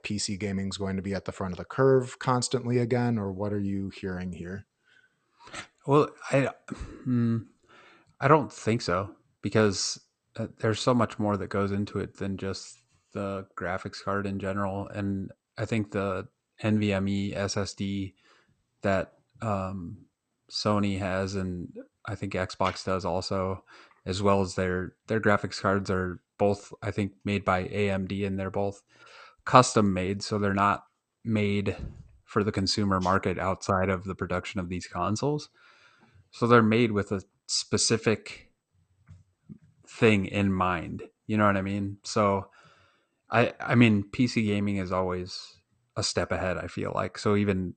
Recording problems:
garbled, watery; slightly; nothing above 8.5 kHz

